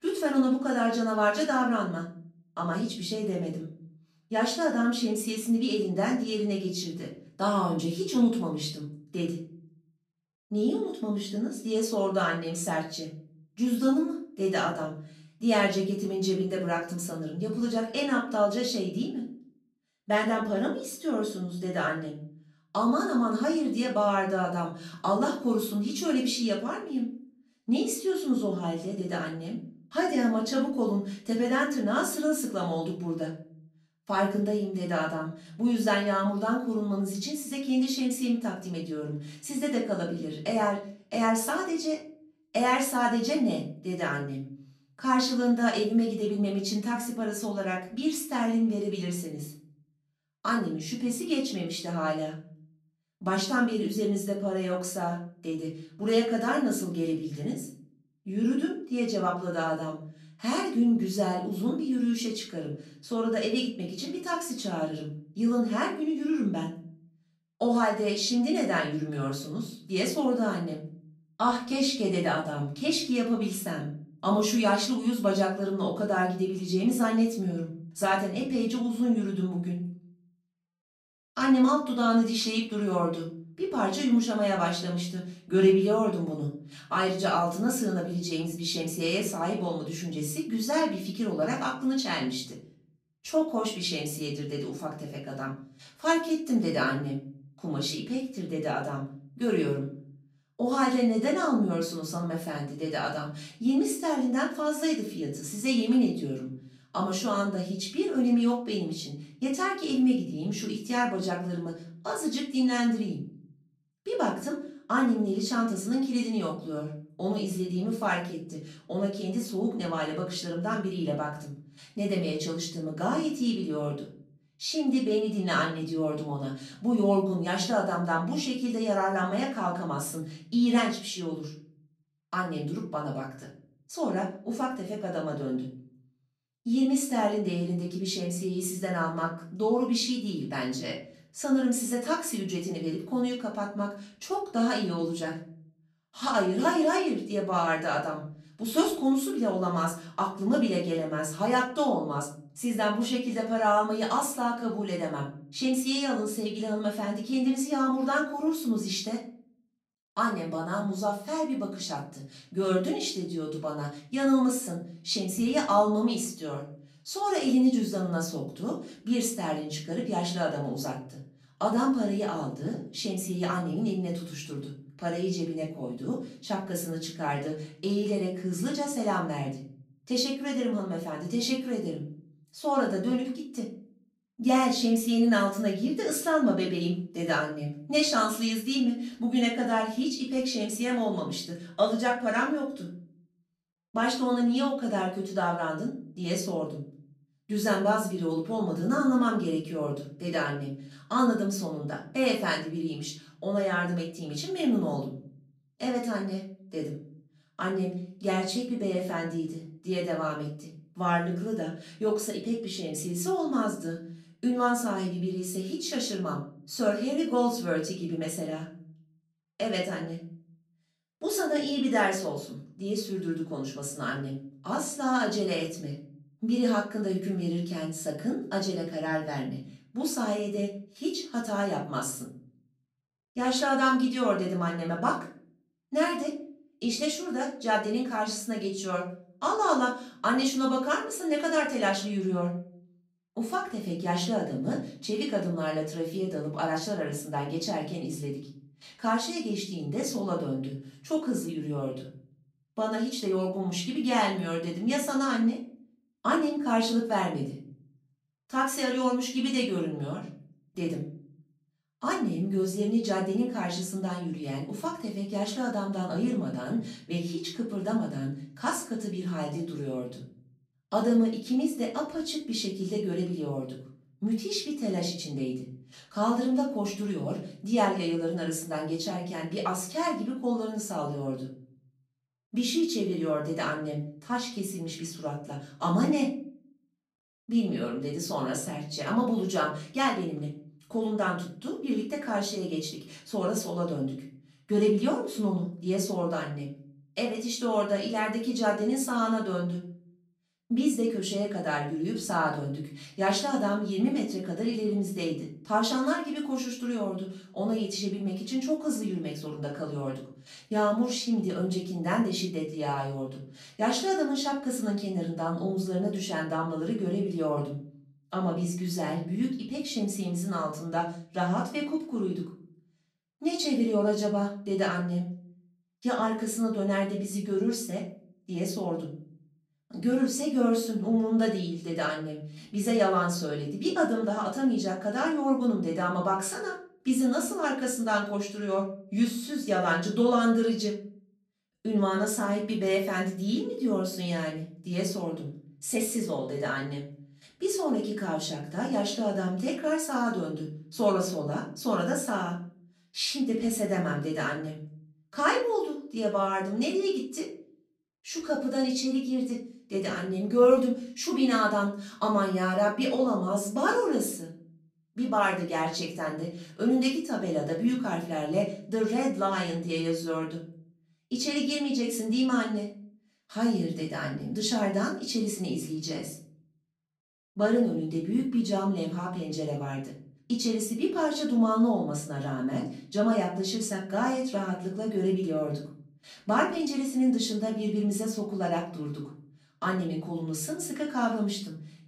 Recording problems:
off-mic speech; far
room echo; slight; dies away in 0.5 s

